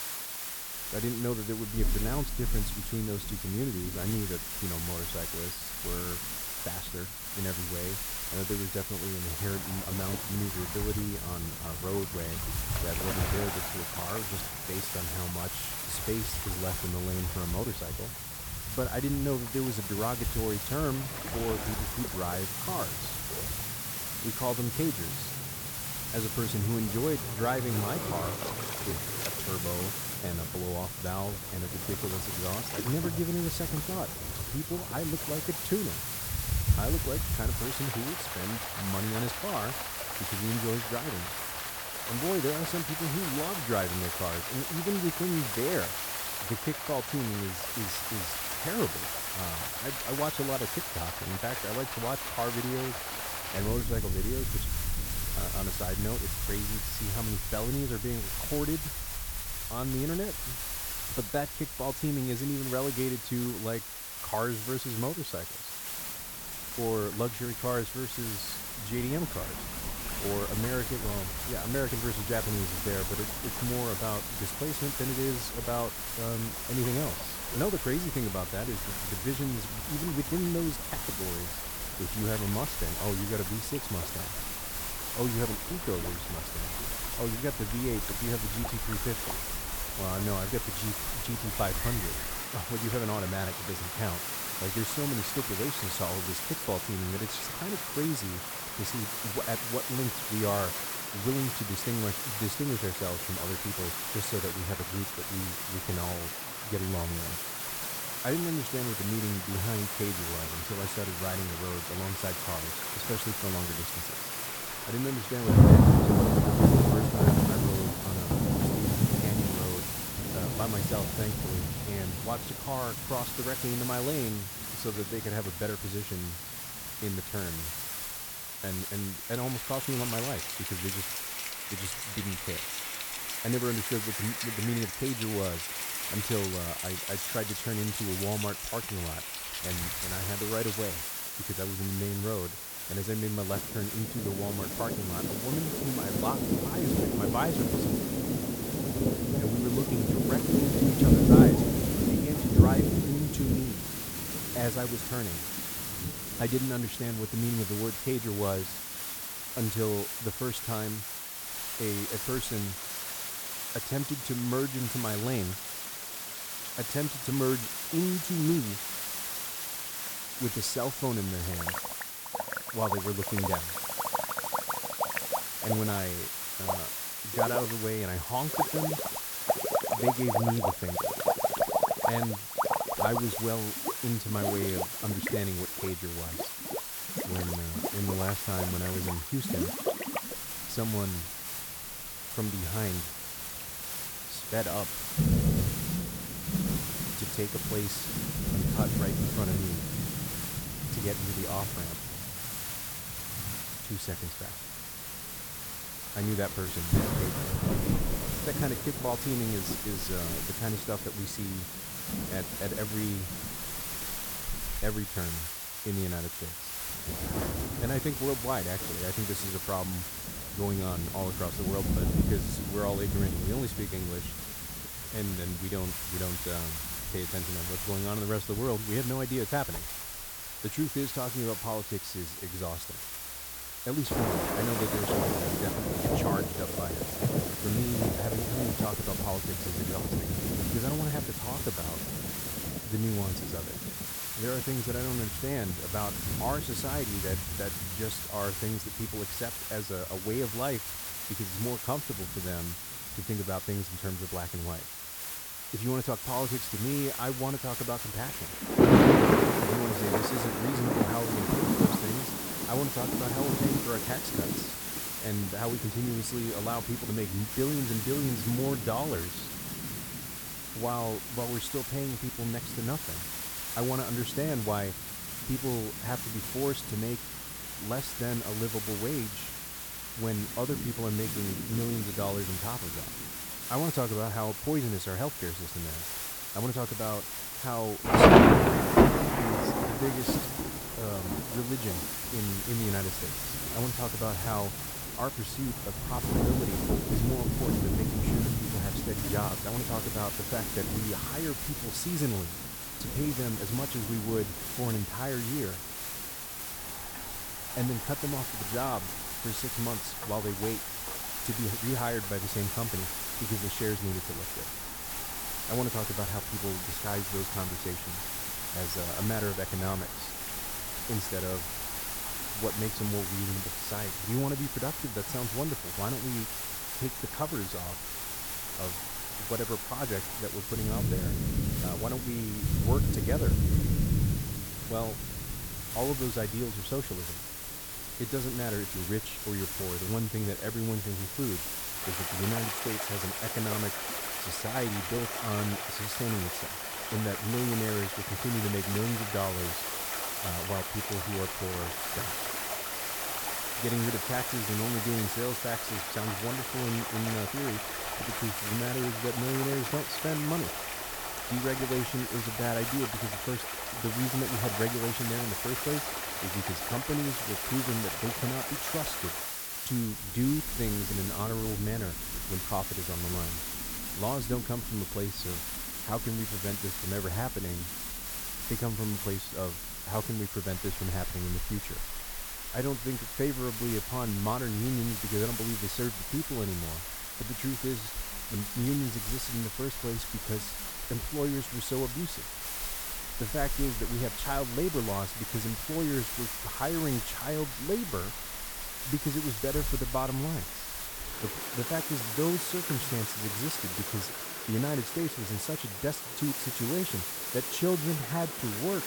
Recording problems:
rain or running water; very loud; throughout; 1 dB above the speech
hiss; loud; throughout; as loud as the speech

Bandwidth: 18.5 kHz